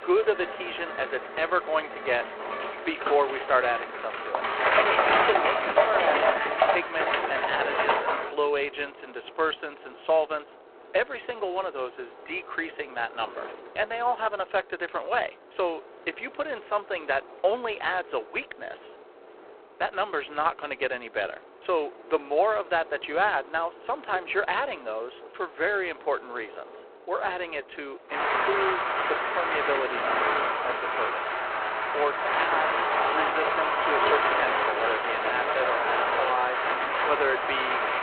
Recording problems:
phone-call audio; poor line
traffic noise; very loud; throughout; 3 dB above the speech

